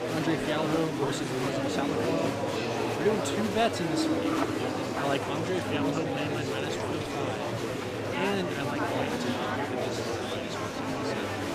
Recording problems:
murmuring crowd; very loud; throughout; 3 dB above the speech

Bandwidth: 15 kHz